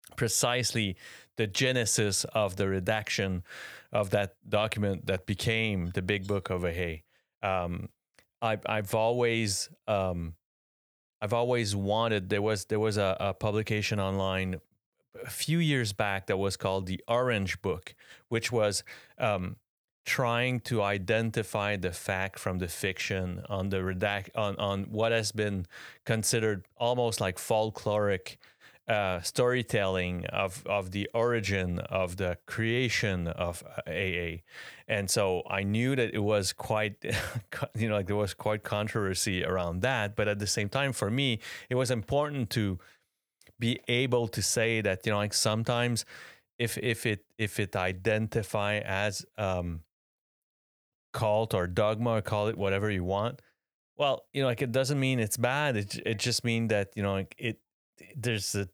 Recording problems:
none

